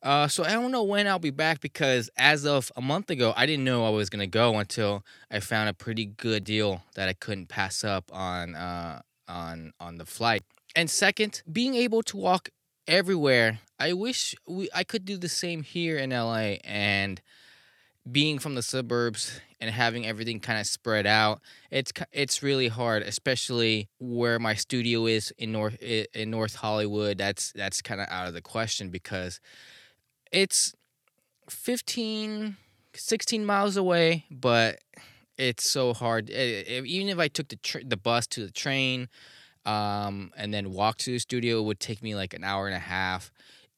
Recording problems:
none

